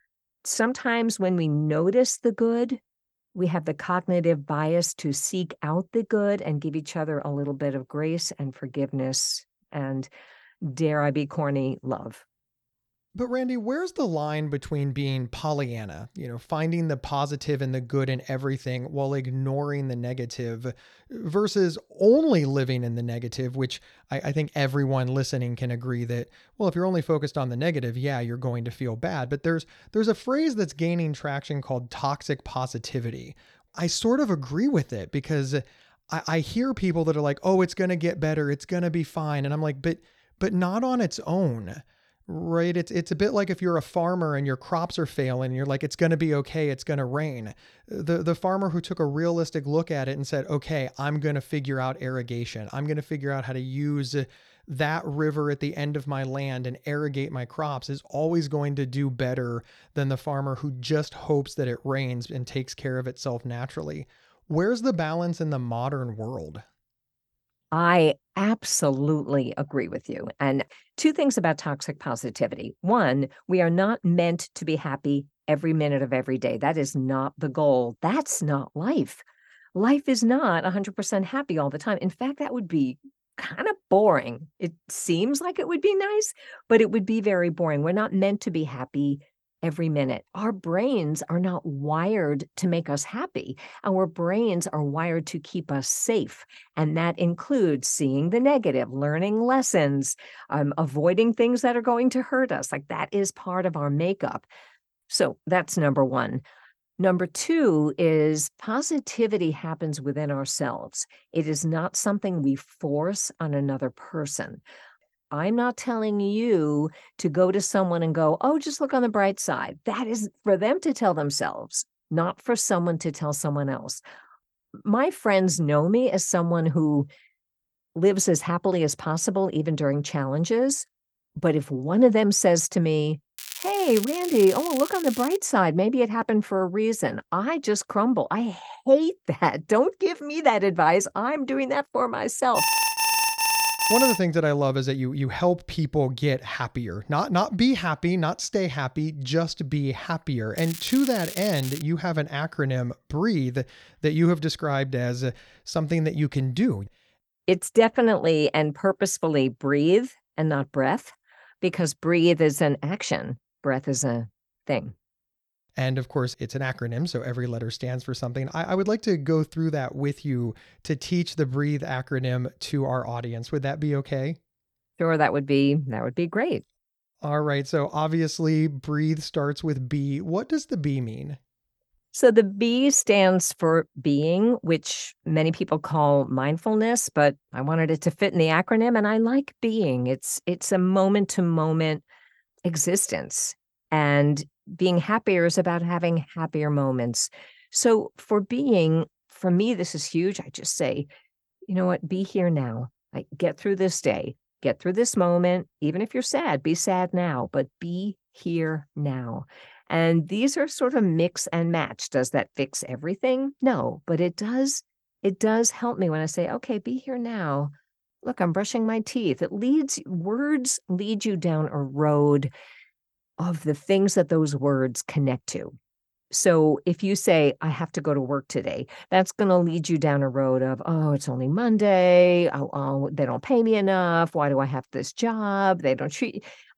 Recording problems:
crackling; noticeable; from 2:13 to 2:15 and from 2:31 to 2:32; 10 dB below the speech
alarm; loud; from 2:23 to 2:24; peak 5 dB above the speech

